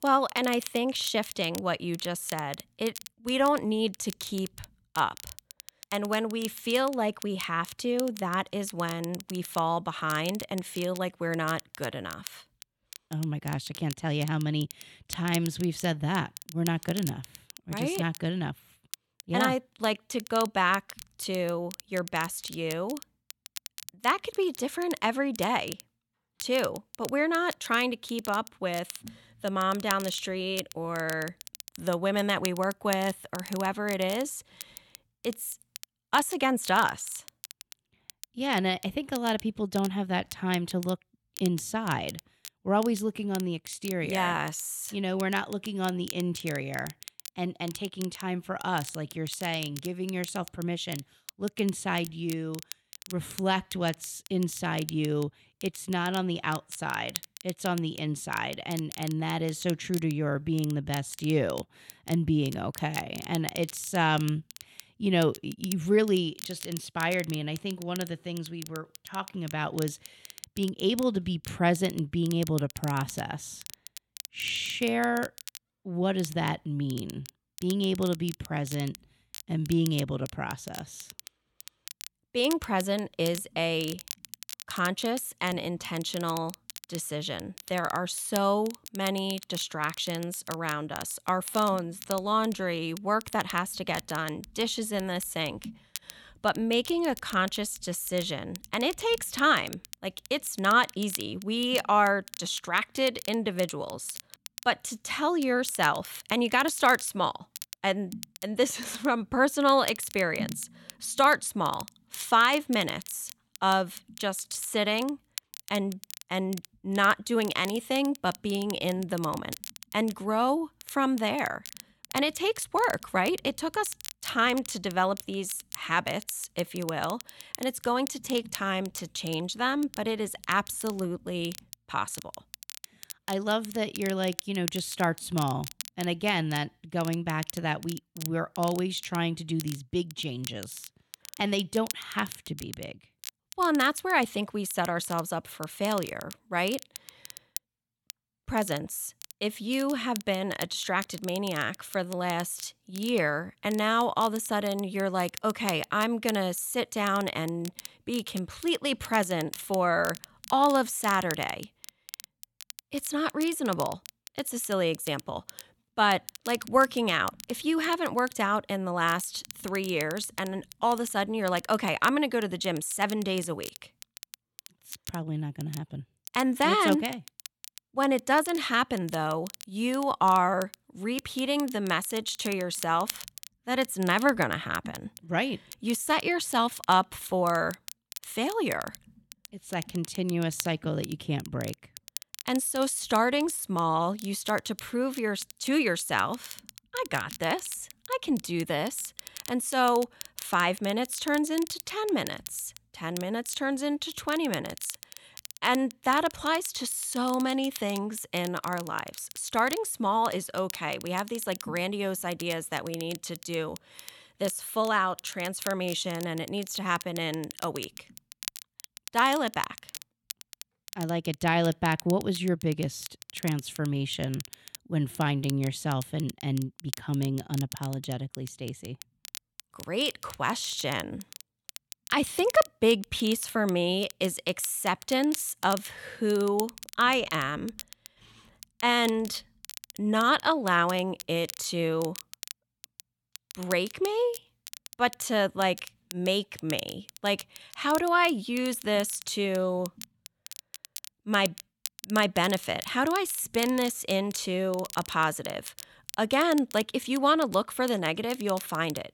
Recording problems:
crackle, like an old record; noticeable; 15 dB below the speech

